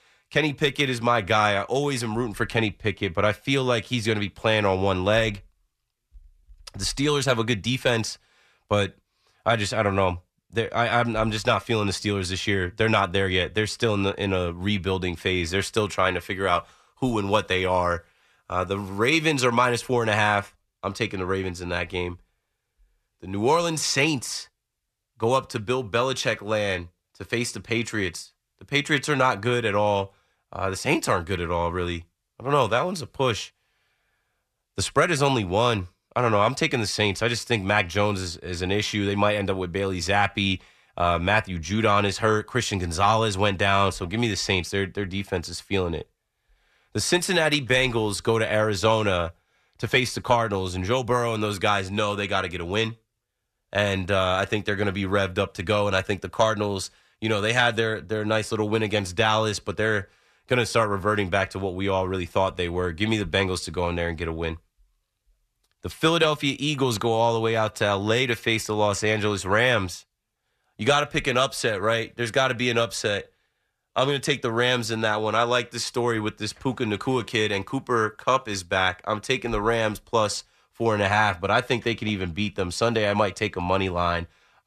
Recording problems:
none

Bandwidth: 14 kHz